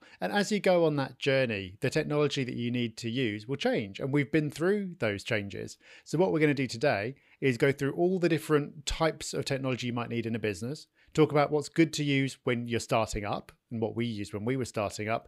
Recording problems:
none

